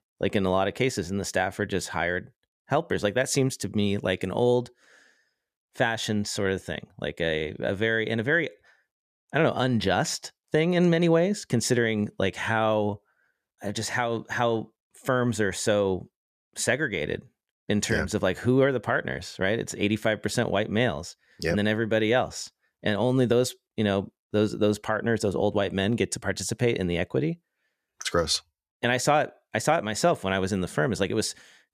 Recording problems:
none

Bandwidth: 14.5 kHz